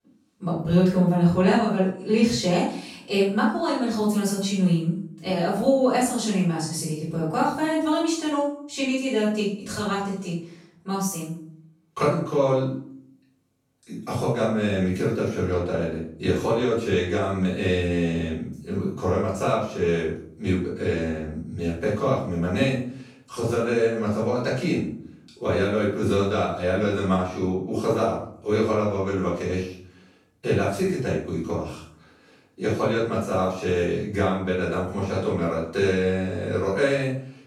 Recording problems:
off-mic speech; far
room echo; noticeable; dies away in 0.5 s

